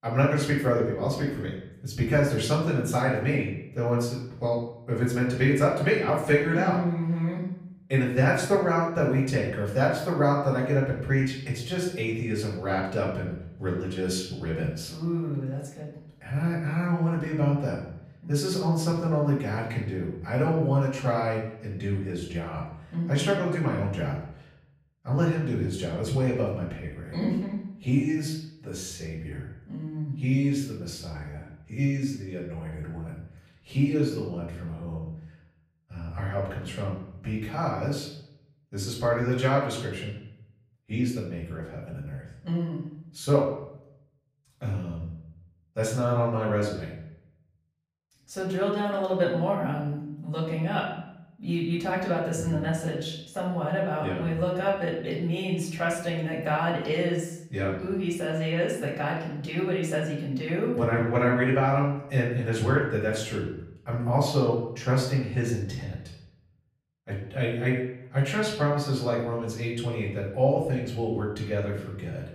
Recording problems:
off-mic speech; far
room echo; noticeable; dies away in 0.7 s

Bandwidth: 15 kHz